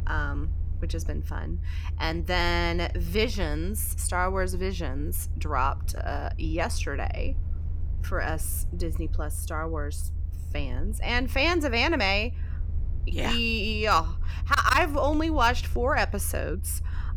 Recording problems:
low rumble; faint; throughout; 25 dB below the speech

